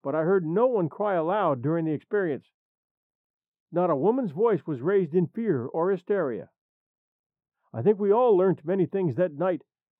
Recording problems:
muffled; very; fading above 2 kHz

